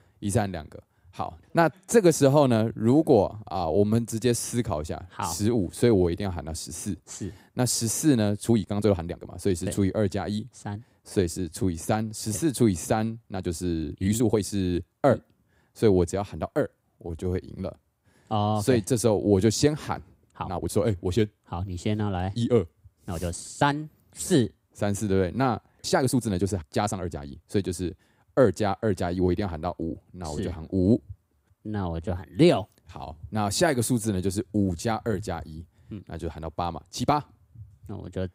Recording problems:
uneven, jittery; strongly; from 3.5 to 37 s

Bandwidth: 15.5 kHz